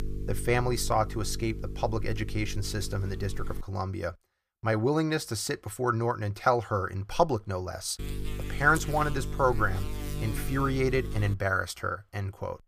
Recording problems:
electrical hum; noticeable; until 3.5 s and from 8 to 11 s; 50 Hz, 15 dB below the speech

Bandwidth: 15 kHz